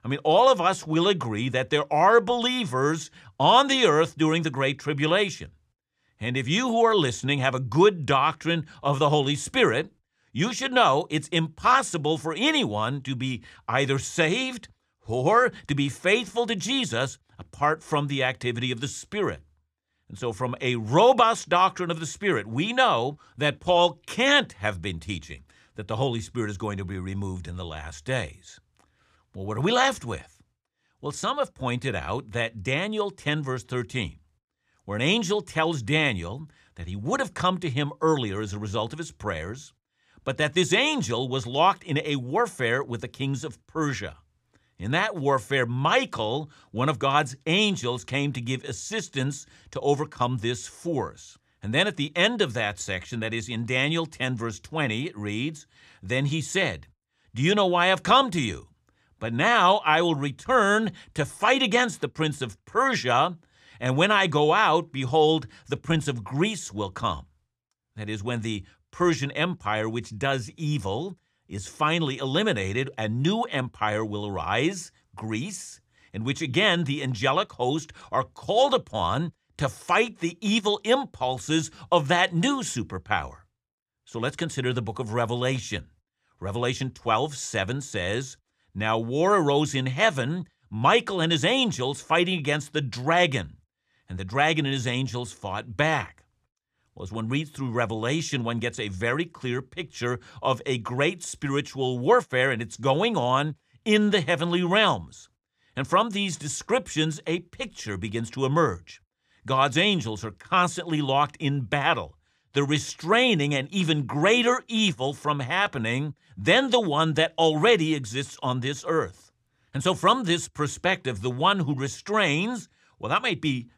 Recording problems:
none

